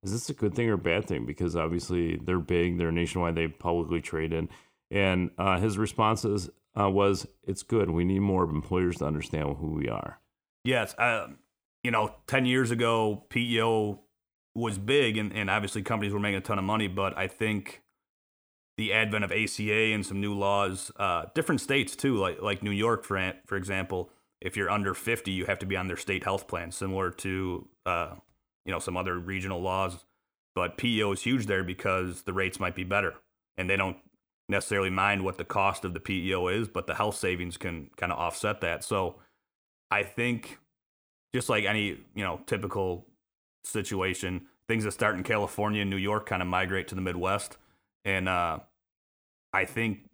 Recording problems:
none

